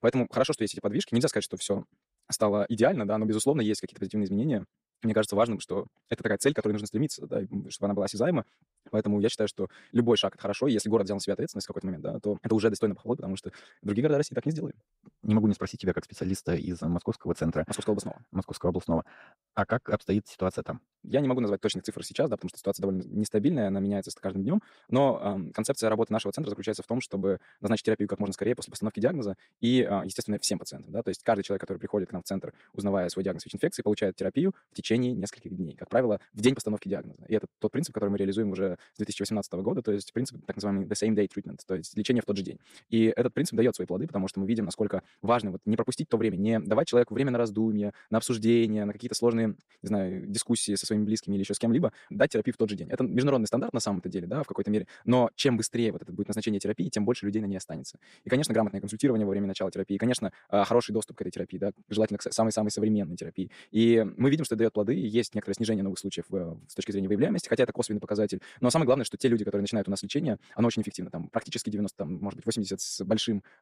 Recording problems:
wrong speed, natural pitch; too fast; 1.5 times normal speed

